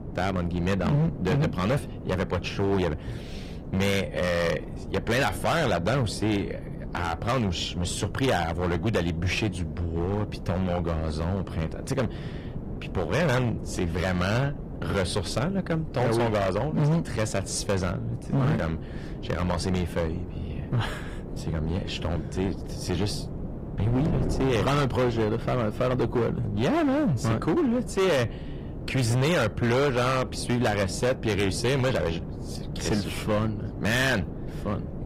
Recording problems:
distortion; heavy; 13% of the sound clipped
garbled, watery; slightly; nothing above 15.5 kHz
wind noise on the microphone; occasional gusts; 15 dB below the speech

